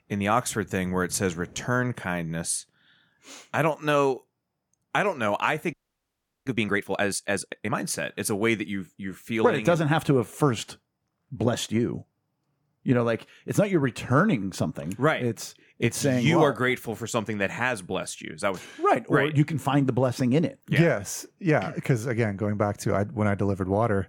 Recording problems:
audio freezing; at 5.5 s for 0.5 s

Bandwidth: 18.5 kHz